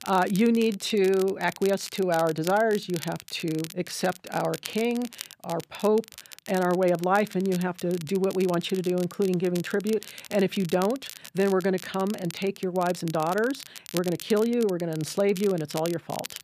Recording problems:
crackle, like an old record; noticeable; 15 dB below the speech

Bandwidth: 14.5 kHz